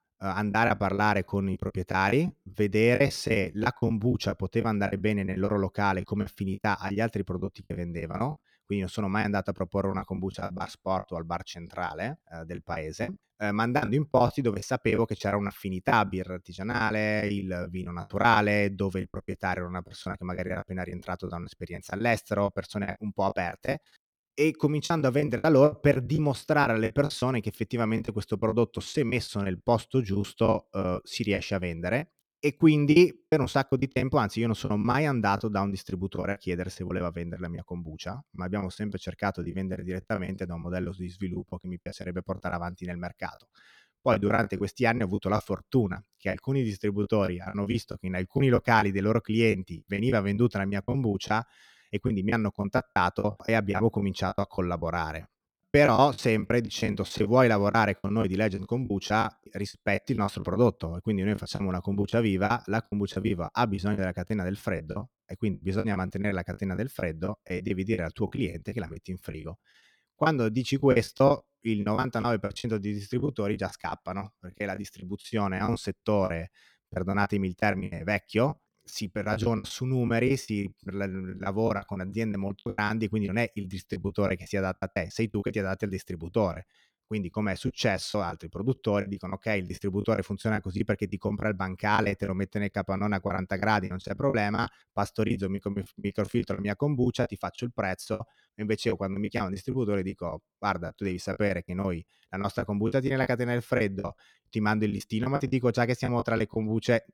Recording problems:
choppy; very; 12% of the speech affected

